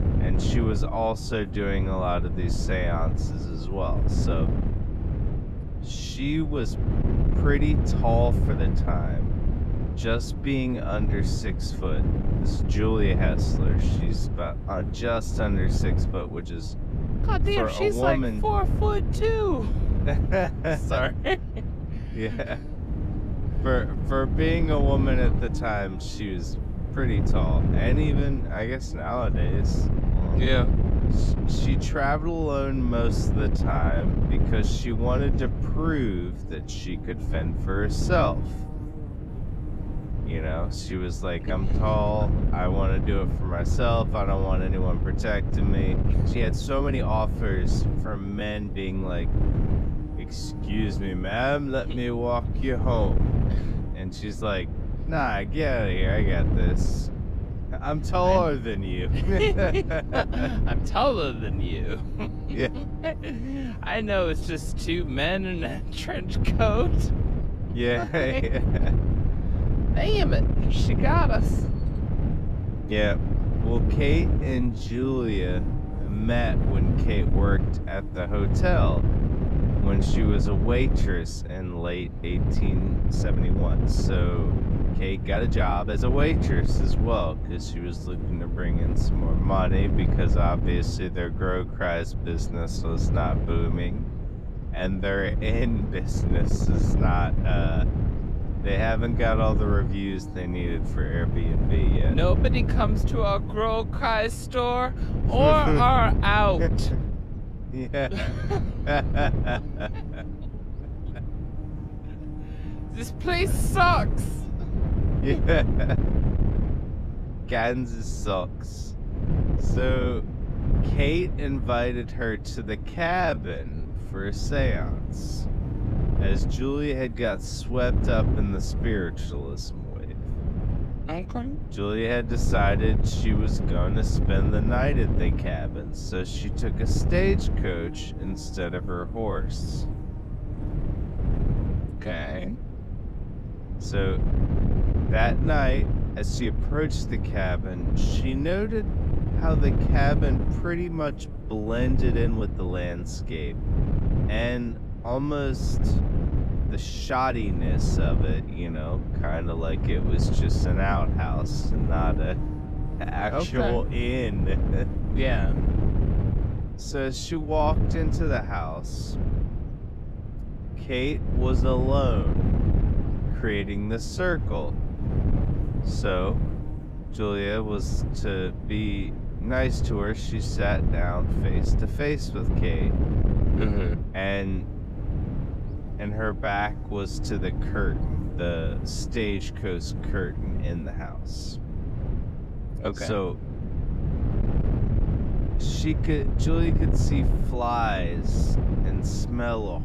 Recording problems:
wrong speed, natural pitch; too slow; 0.6 times normal speed
wind noise on the microphone; heavy; 9 dB below the speech
electrical hum; faint; throughout; 50 Hz, 20 dB below the speech
uneven, jittery; strongly; from 8.5 s to 3:18

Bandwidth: 14.5 kHz